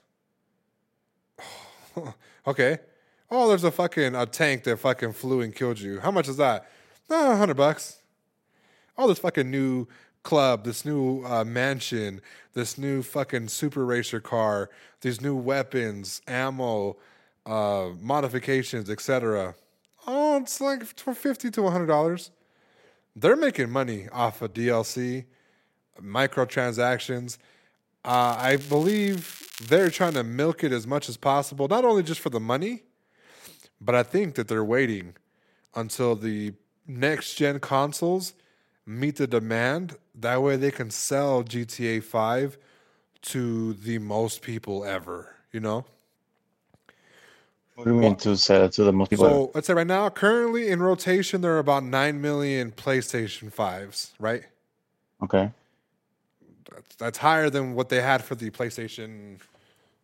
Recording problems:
crackling; noticeable; from 28 to 30 s; 15 dB below the speech
uneven, jittery; strongly; from 9 to 59 s

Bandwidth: 16 kHz